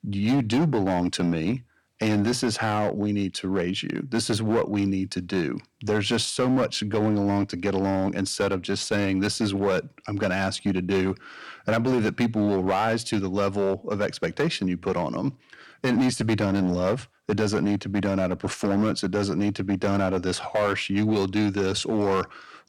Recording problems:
distortion; slight; 9% of the sound clipped

